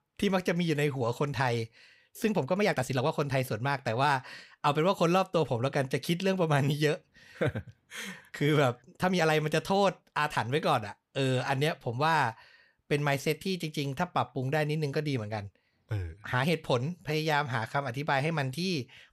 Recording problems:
uneven, jittery; strongly; from 2.5 to 18 s

